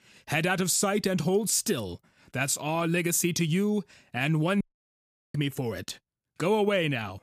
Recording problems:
audio cutting out; at 4.5 s for 0.5 s

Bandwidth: 14.5 kHz